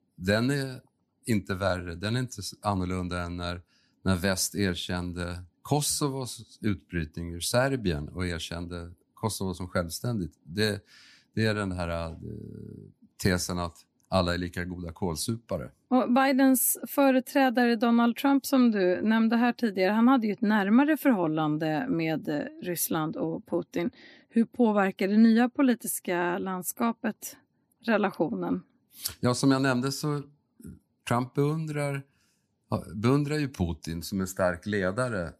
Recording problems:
none

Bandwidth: 14.5 kHz